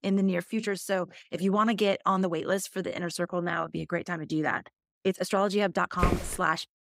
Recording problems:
uneven, jittery; strongly; from 0.5 to 6 s
footsteps; noticeable; at 6 s; peak 1 dB below the speech

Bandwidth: 15.5 kHz